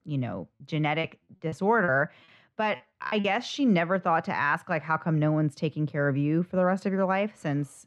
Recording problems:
muffled; very; fading above 2 kHz
choppy; very; from 1 to 3 s; 6% of the speech affected

